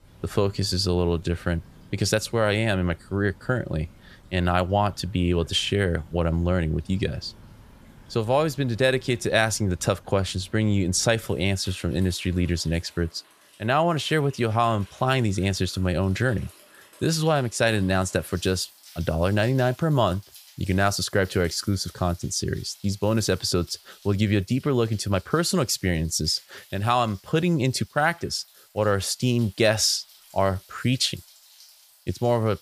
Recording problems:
rain or running water; faint; throughout; 25 dB below the speech

